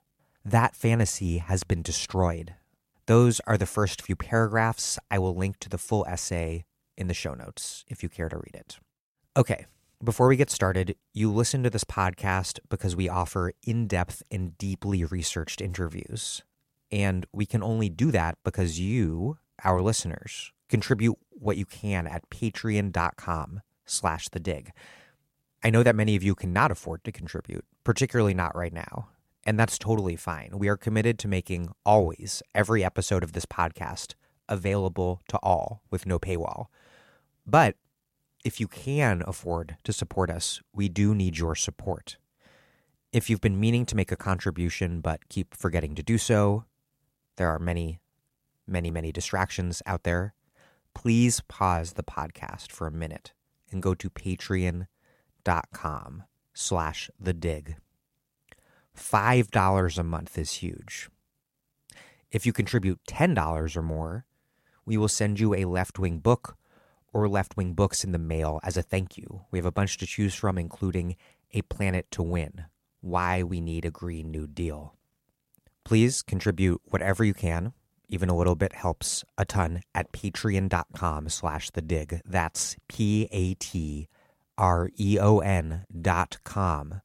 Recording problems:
none

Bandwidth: 16 kHz